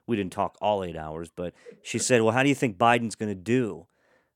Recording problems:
none

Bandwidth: 17.5 kHz